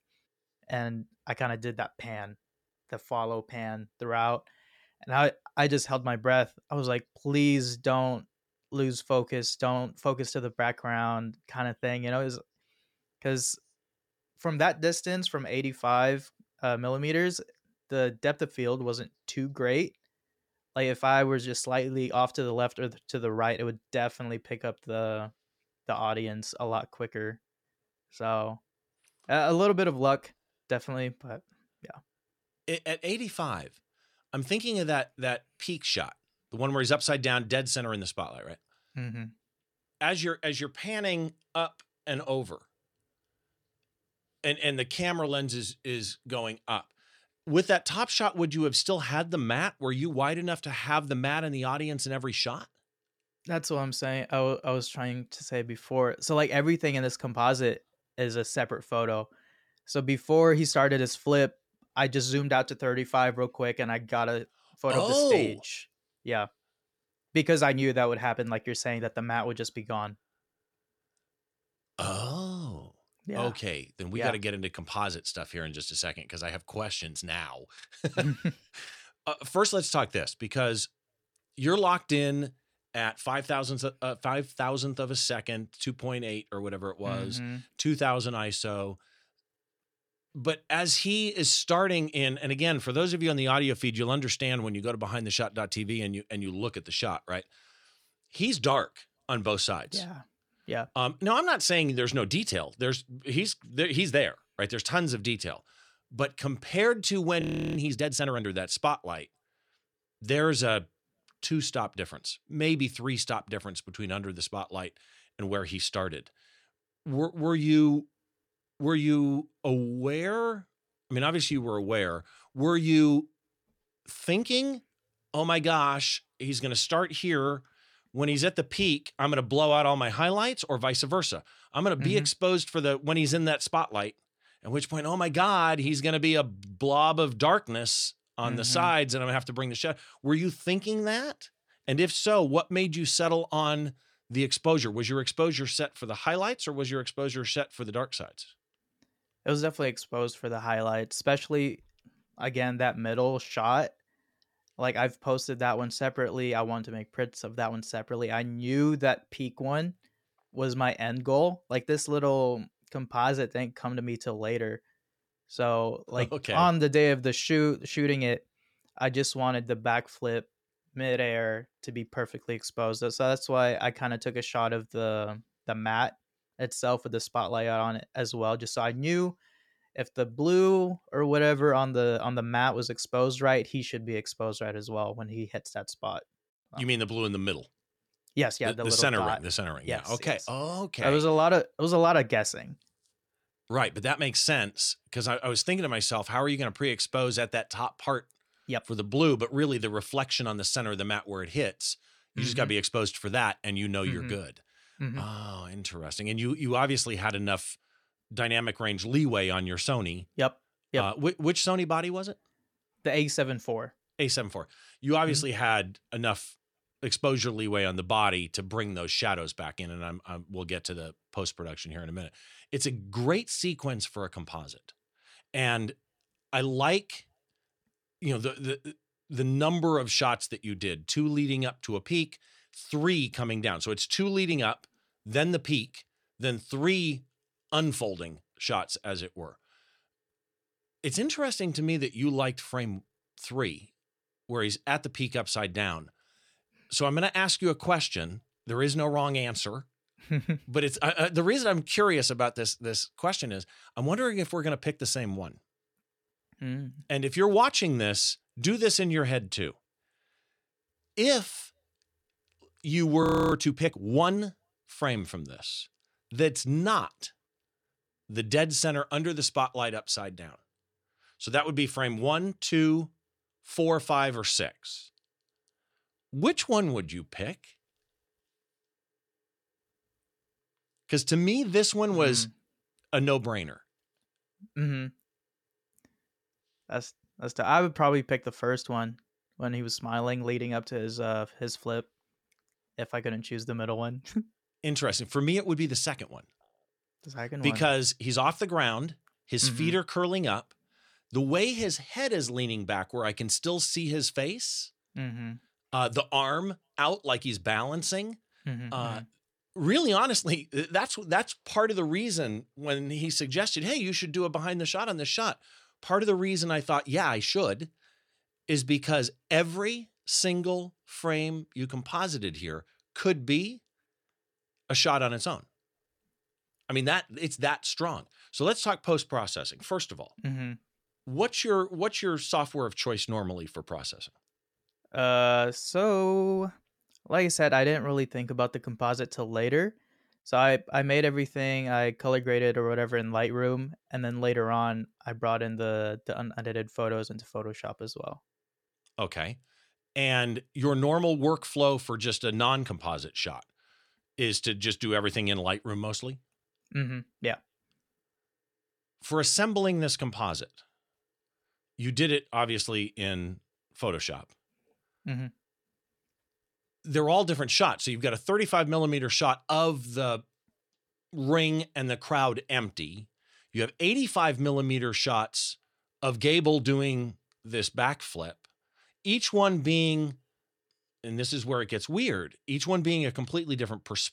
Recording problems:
audio freezing; at 1:47 and at 4:23

